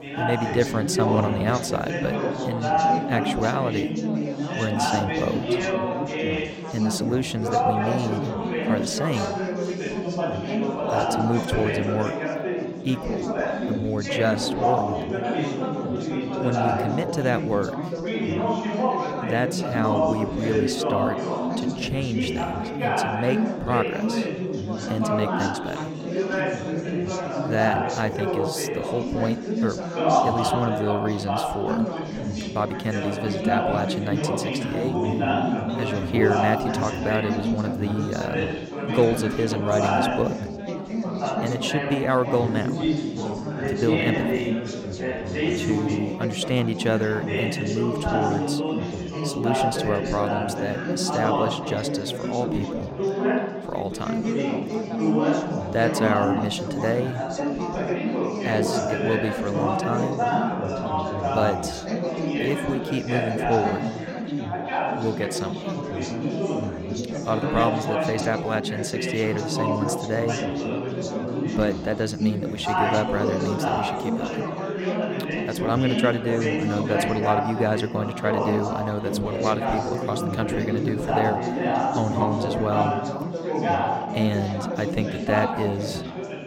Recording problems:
chatter from many people; very loud; throughout; 1 dB above the speech

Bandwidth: 16.5 kHz